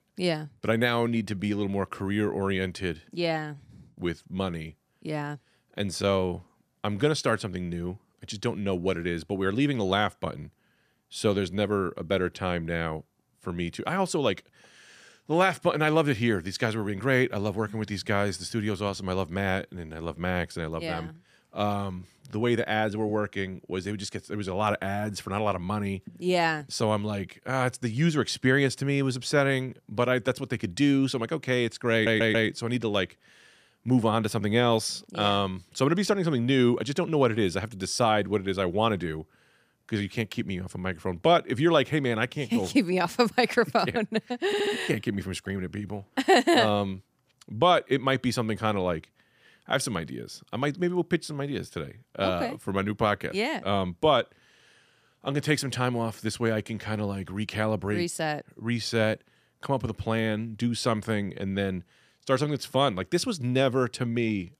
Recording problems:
audio stuttering; at 32 s and at 44 s

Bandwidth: 15 kHz